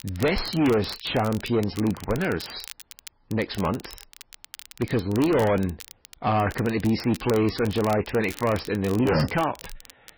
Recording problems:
distortion; heavy; 6 dB below the speech
garbled, watery; badly; nothing above 5.5 kHz
crackle, like an old record; noticeable; 20 dB below the speech

